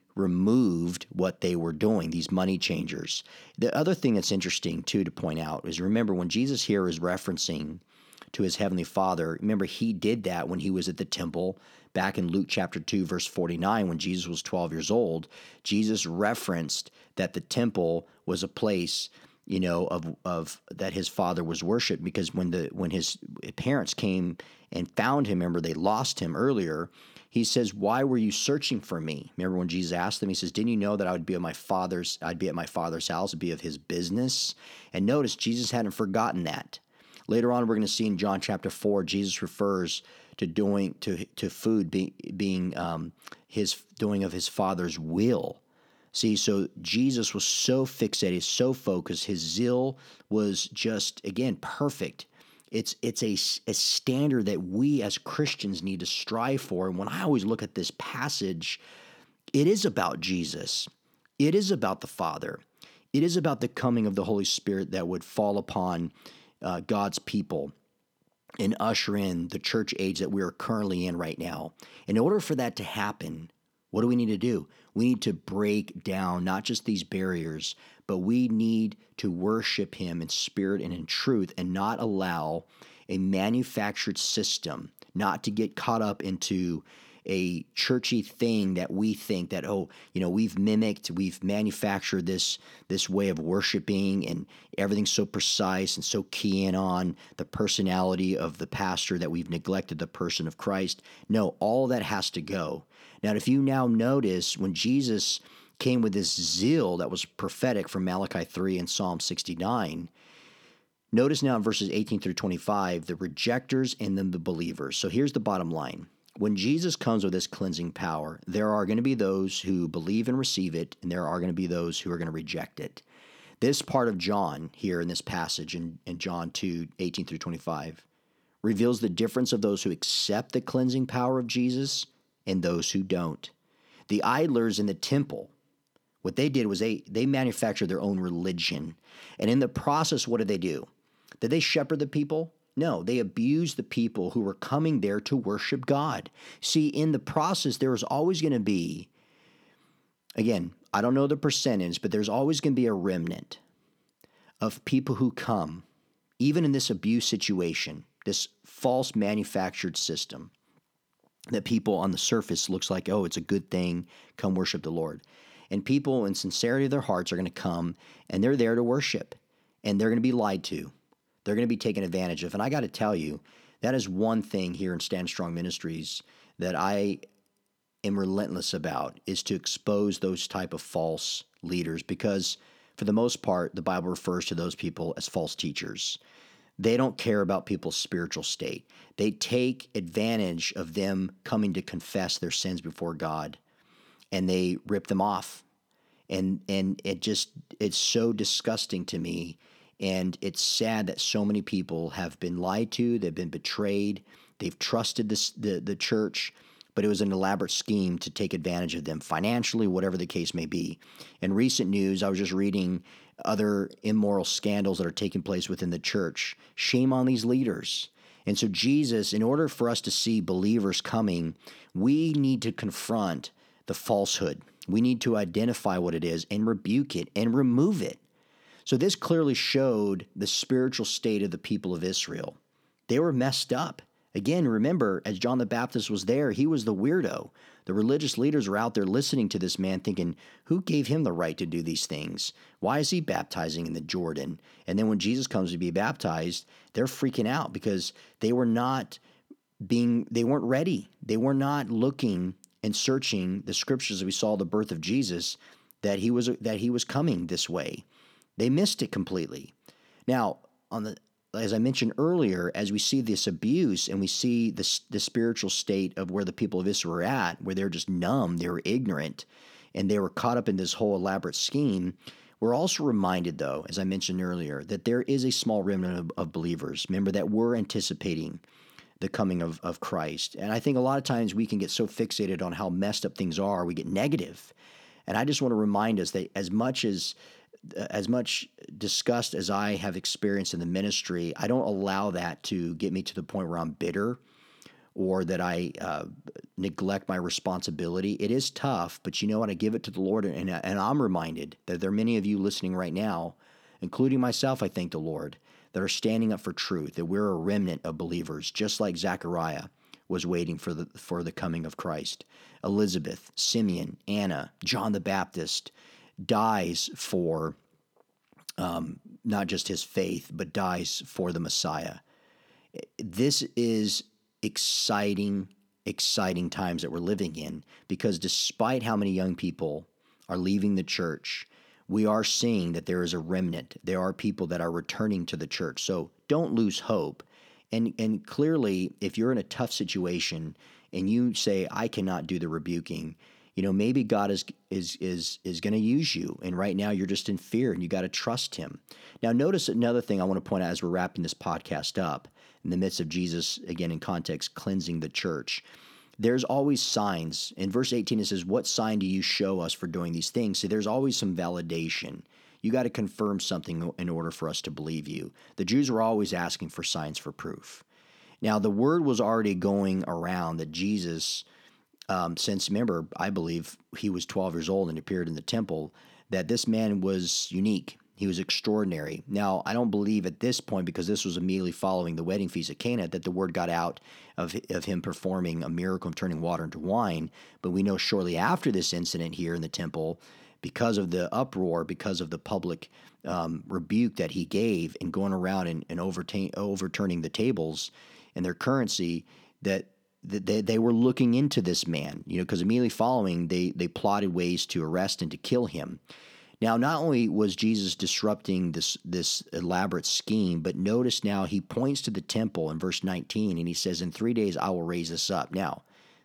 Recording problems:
none

